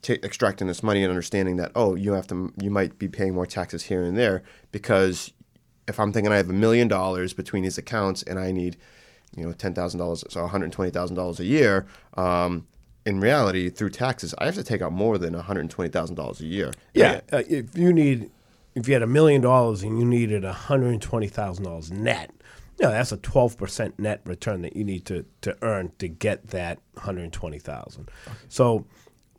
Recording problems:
none

